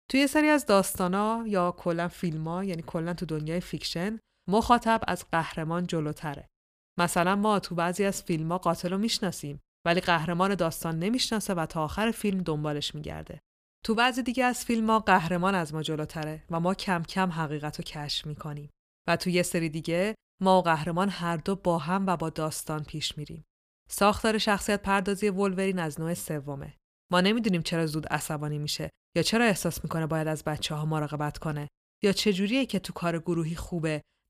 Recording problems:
none

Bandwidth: 15 kHz